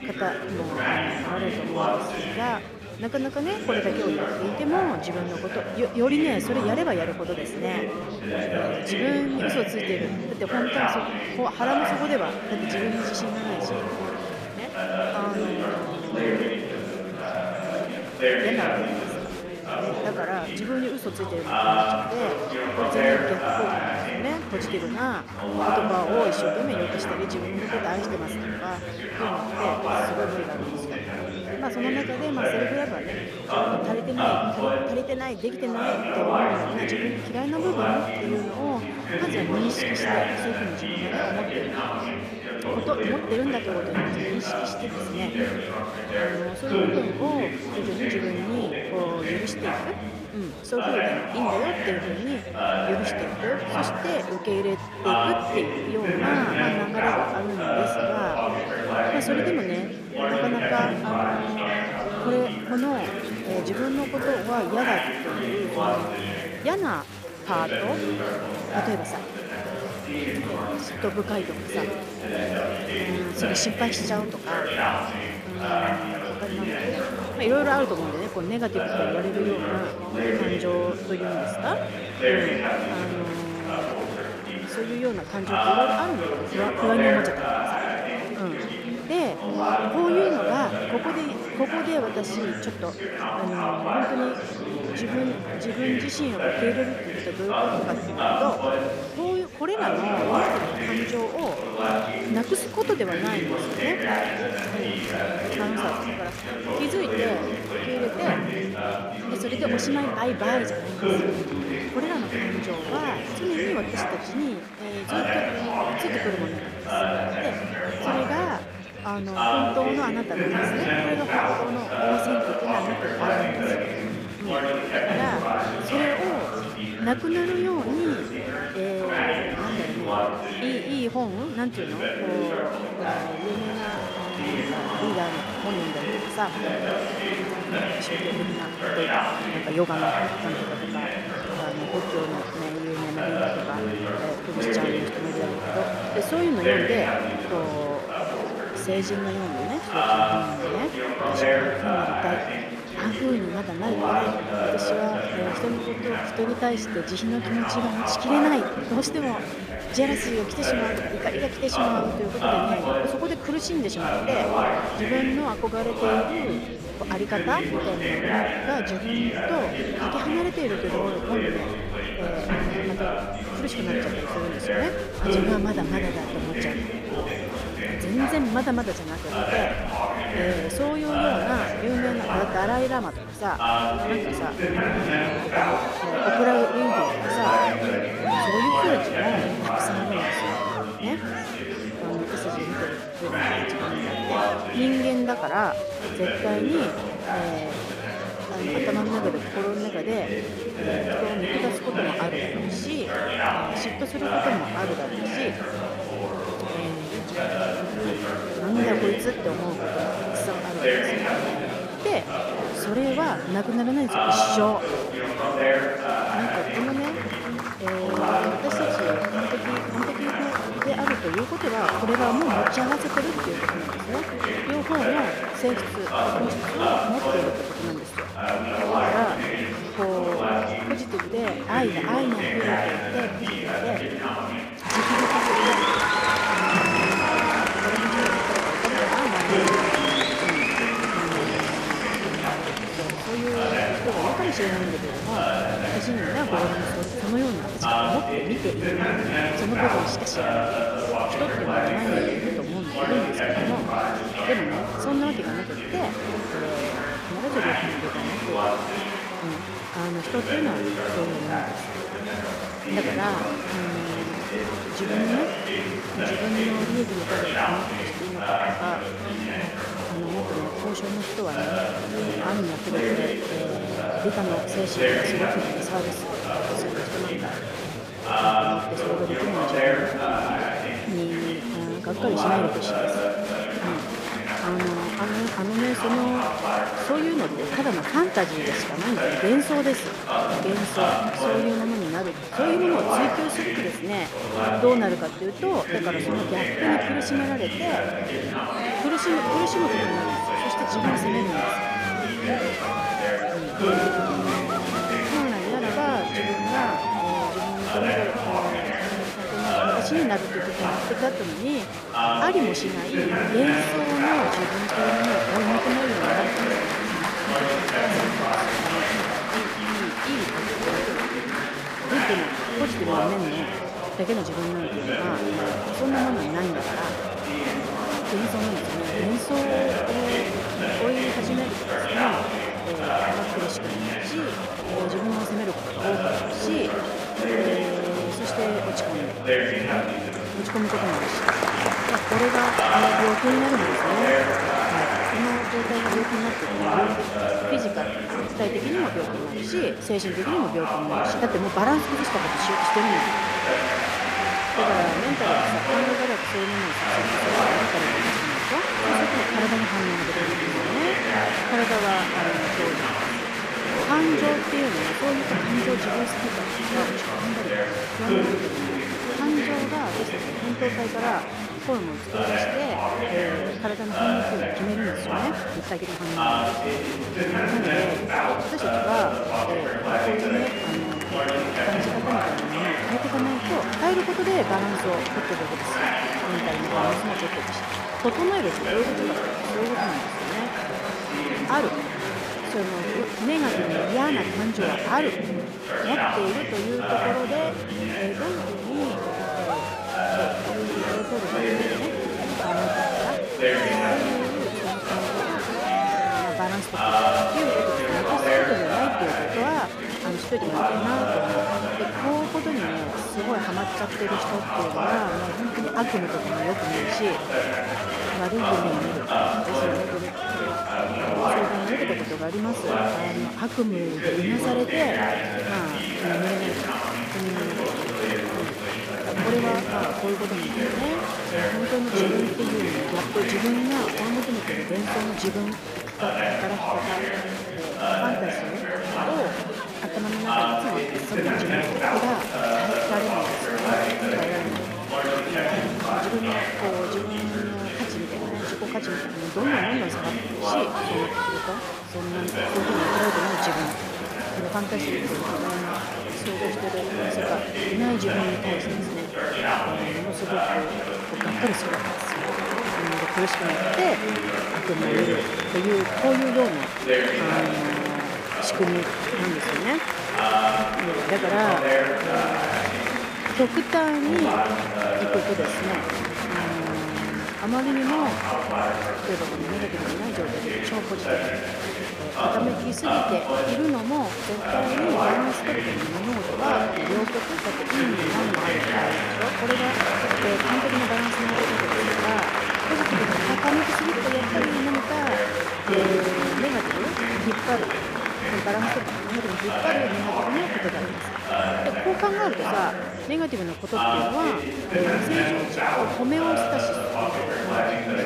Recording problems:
chatter from many people; very loud; throughout; 3 dB above the speech
uneven, jittery; strongly; from 43 s to 8:25

